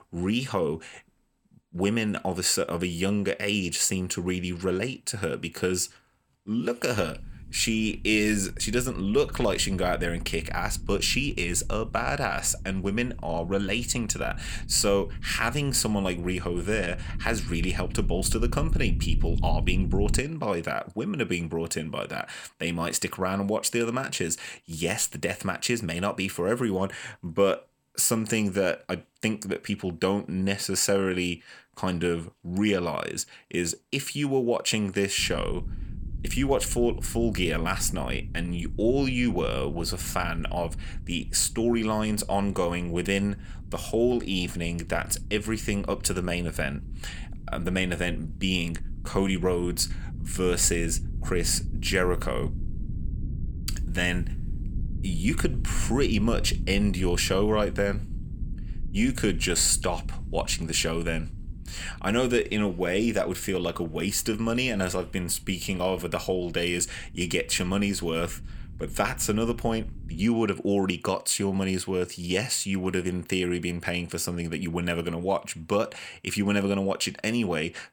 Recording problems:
low rumble; faint; from 7 to 20 s and from 35 s to 1:10; 20 dB below the speech

